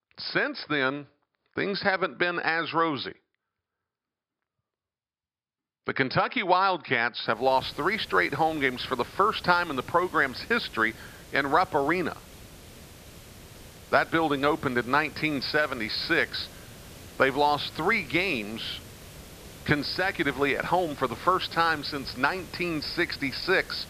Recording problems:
high frequencies cut off; noticeable; nothing above 5.5 kHz
hiss; noticeable; from 7.5 s on; 20 dB below the speech

